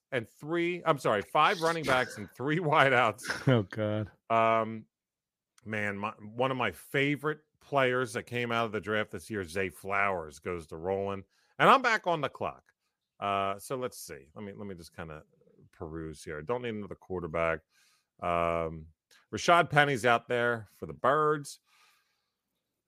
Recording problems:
none

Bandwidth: 15 kHz